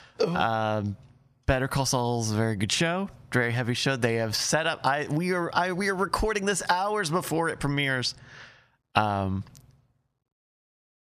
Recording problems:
squashed, flat; somewhat

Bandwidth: 14.5 kHz